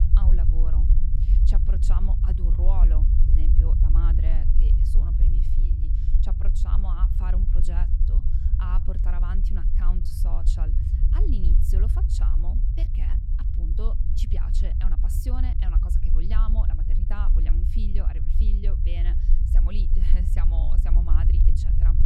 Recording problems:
low rumble; loud; throughout; 1 dB below the speech

